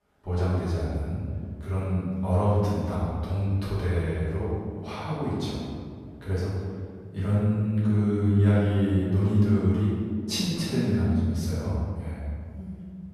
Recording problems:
room echo; strong; dies away in 1.8 s
off-mic speech; far

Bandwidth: 14.5 kHz